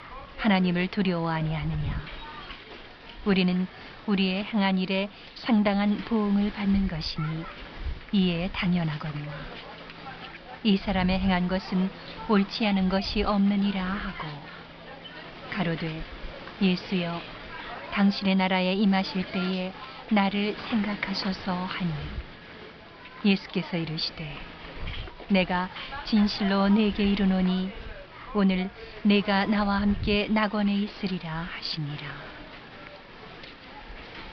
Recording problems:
high frequencies cut off; noticeable; nothing above 5.5 kHz
hiss; noticeable; throughout; 15 dB below the speech

